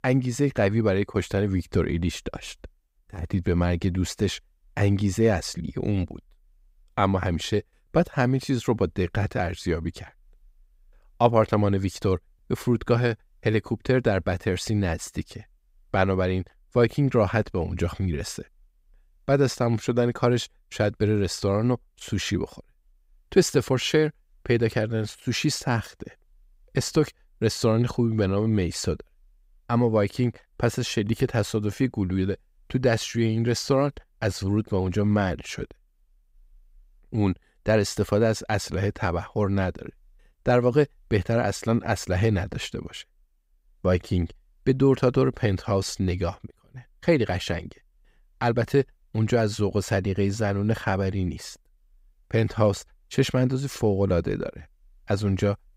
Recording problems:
none

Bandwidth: 15.5 kHz